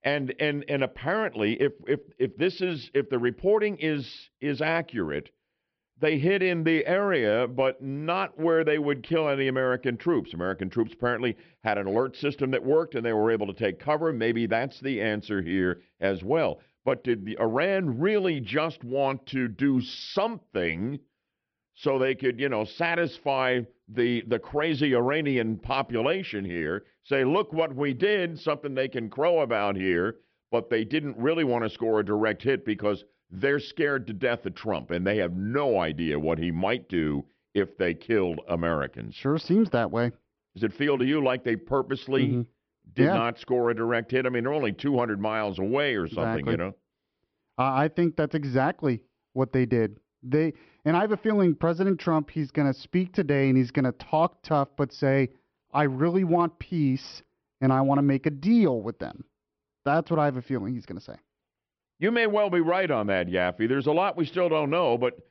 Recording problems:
high frequencies cut off; noticeable; nothing above 5.5 kHz

